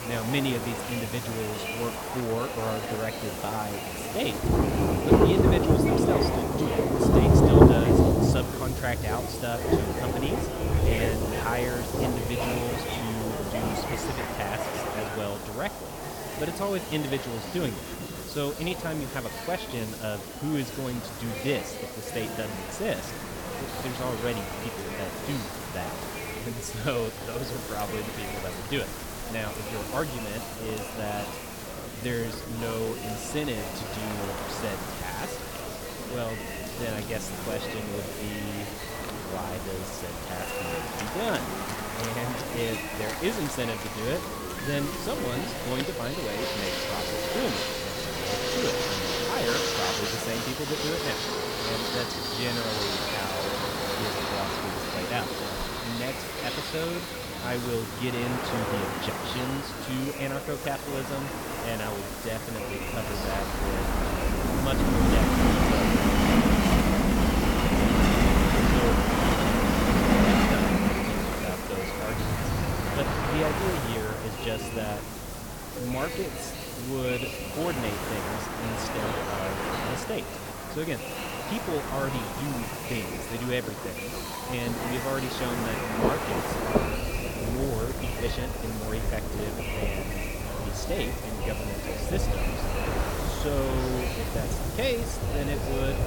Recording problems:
rain or running water; very loud; throughout; 4 dB above the speech
train or aircraft noise; very loud; throughout; 3 dB above the speech
murmuring crowd; loud; throughout; 3 dB below the speech
hiss; loud; throughout; 6 dB below the speech

